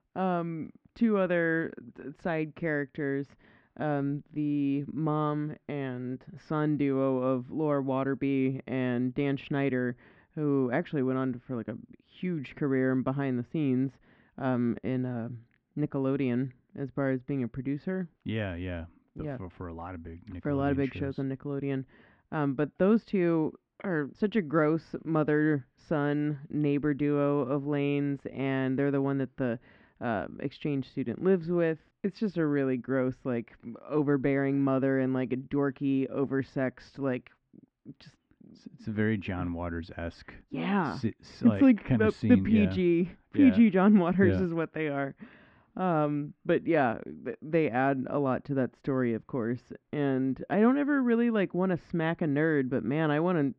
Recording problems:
muffled; very; fading above 2.5 kHz

